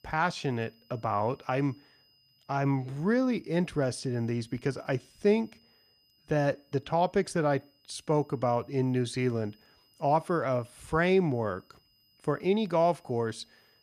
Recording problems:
high-pitched whine; faint; throughout; 5 kHz, 35 dB below the speech

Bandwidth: 15 kHz